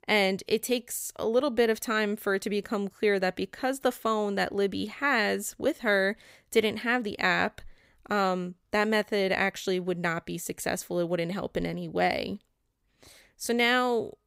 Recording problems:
none

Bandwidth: 15.5 kHz